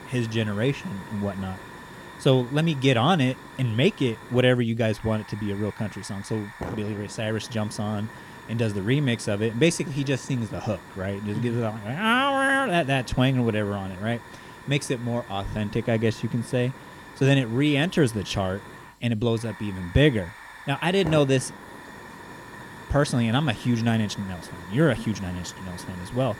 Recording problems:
hiss; noticeable; throughout; 15 dB below the speech

